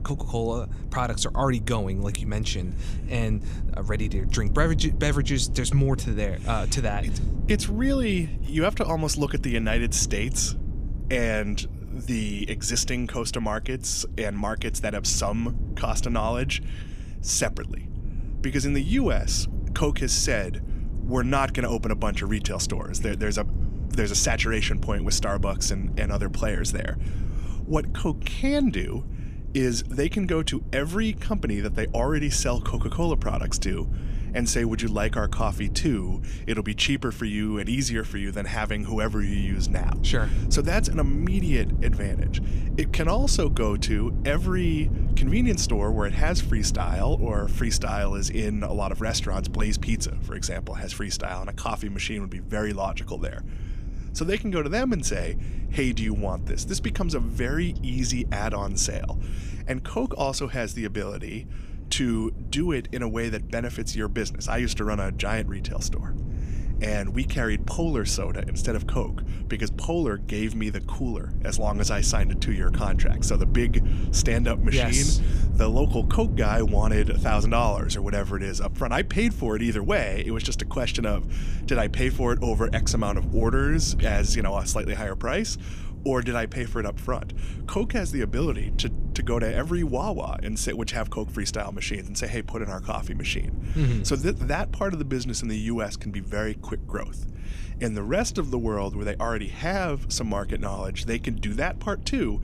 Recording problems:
low rumble; noticeable; throughout; 15 dB below the speech

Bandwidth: 14.5 kHz